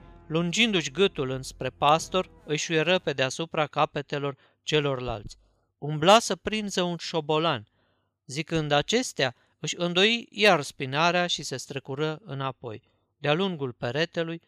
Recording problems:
background music; faint; until 3 s; 30 dB below the speech

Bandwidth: 15 kHz